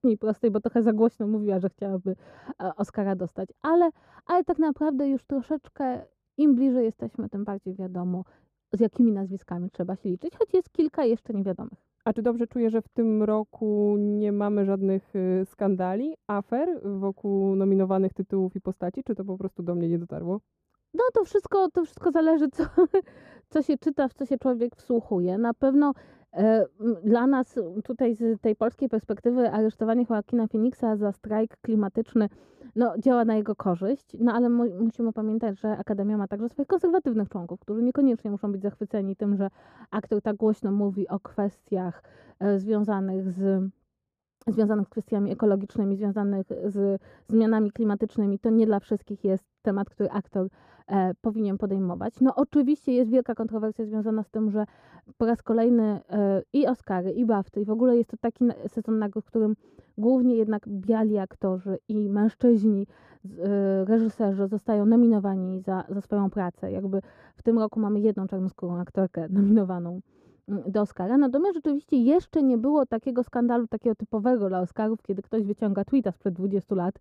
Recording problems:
muffled; very; fading above 1.5 kHz

